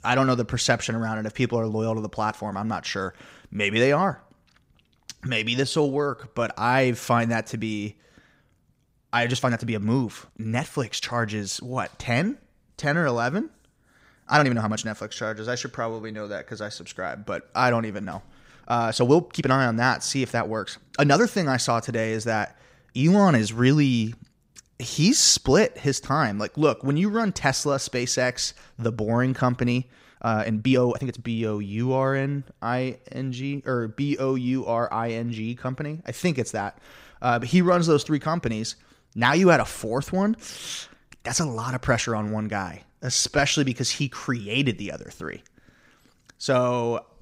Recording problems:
uneven, jittery; strongly; from 5 to 43 s

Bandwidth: 15.5 kHz